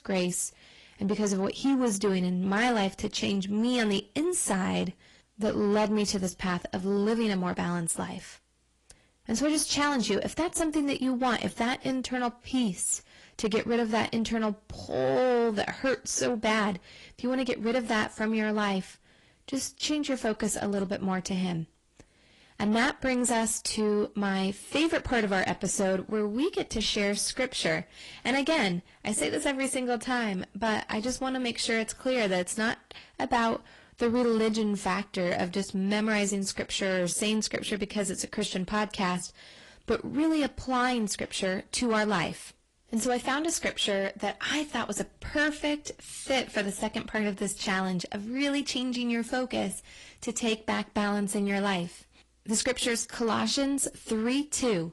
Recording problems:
distortion; slight; 10 dB below the speech
garbled, watery; slightly; nothing above 11 kHz

